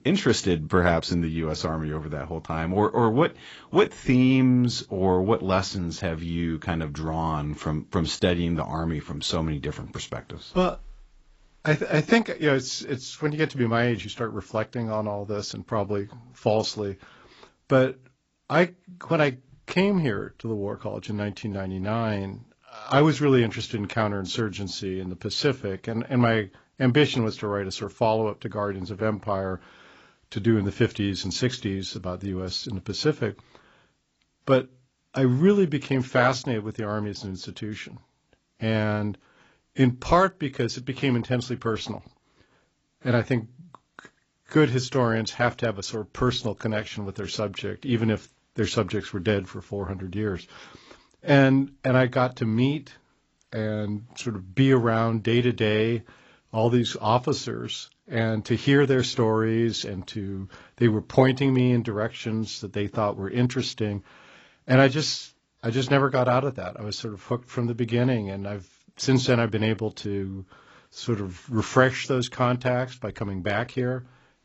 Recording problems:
garbled, watery; badly; nothing above 7.5 kHz

